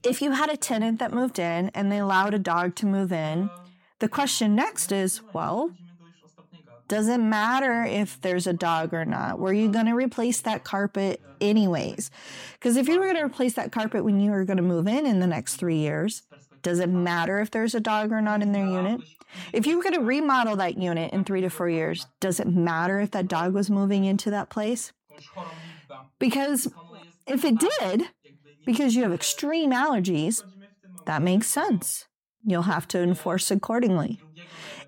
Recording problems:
voice in the background; faint; throughout; 25 dB below the speech

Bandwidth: 17 kHz